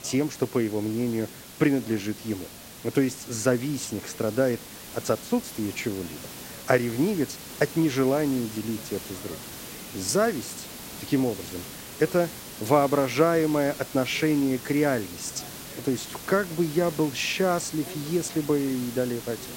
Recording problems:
hiss; noticeable; throughout; 10 dB below the speech
voice in the background; faint; throughout; 25 dB below the speech

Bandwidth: 16 kHz